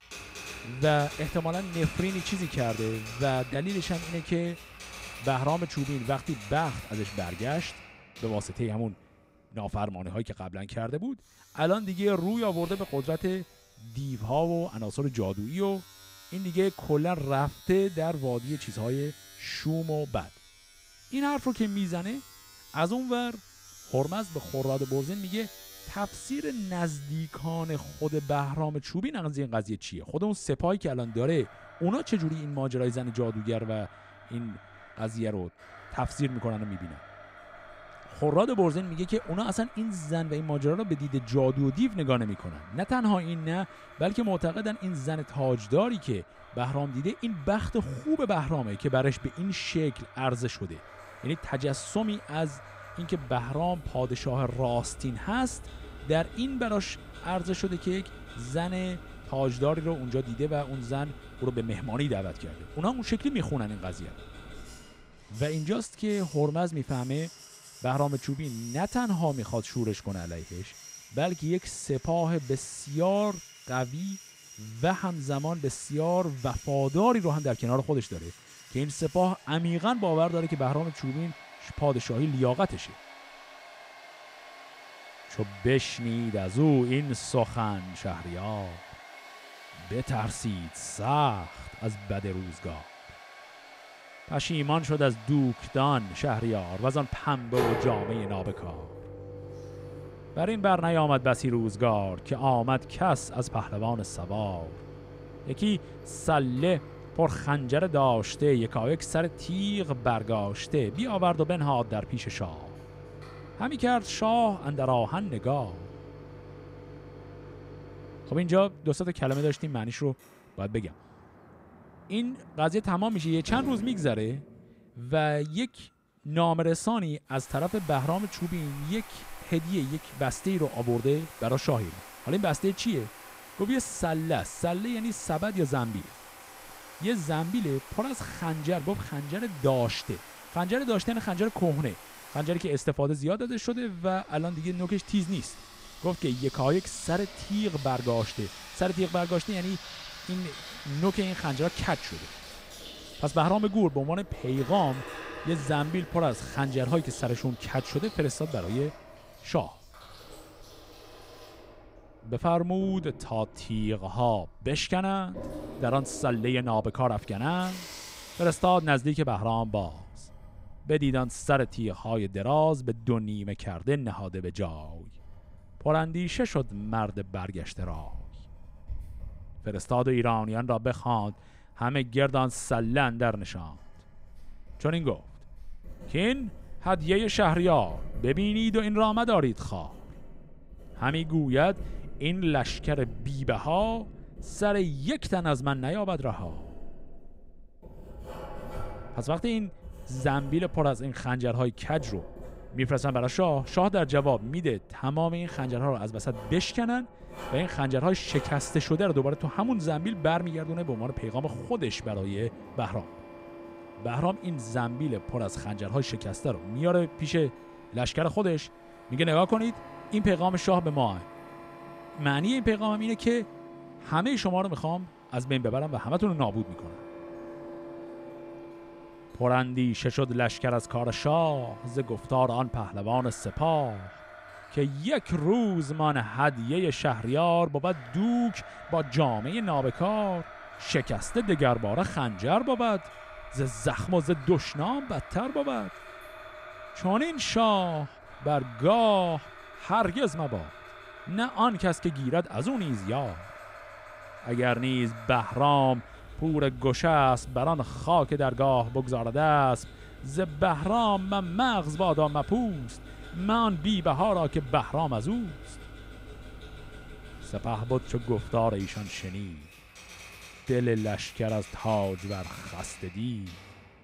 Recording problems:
household noises; noticeable; throughout; 15 dB below the speech

